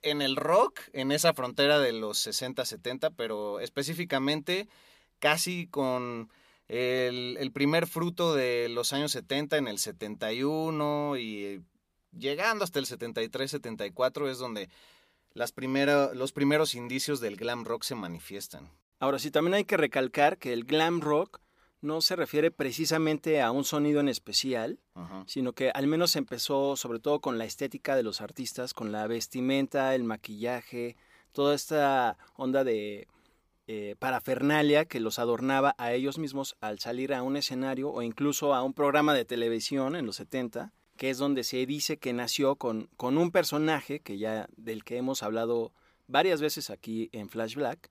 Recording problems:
none

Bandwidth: 15 kHz